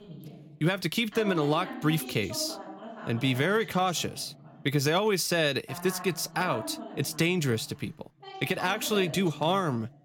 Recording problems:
voice in the background; noticeable; throughout; 15 dB below the speech

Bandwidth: 17 kHz